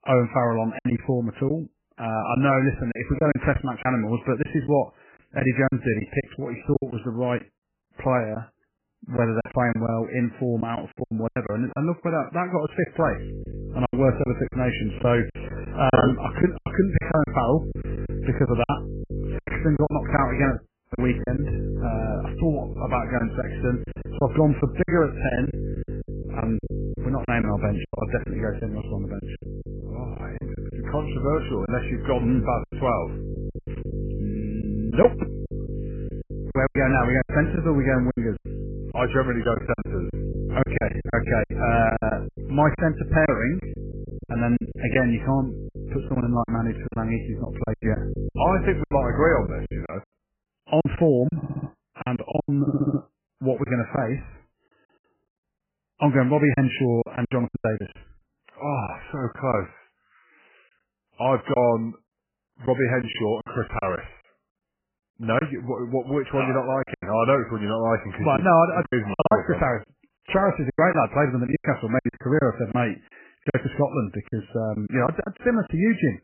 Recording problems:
garbled, watery; badly; nothing above 3 kHz
electrical hum; noticeable; from 13 to 50 s; 50 Hz, 15 dB below the speech
choppy; very; 9% of the speech affected
audio cutting out; at 21 s
audio stuttering; at 51 s and at 53 s

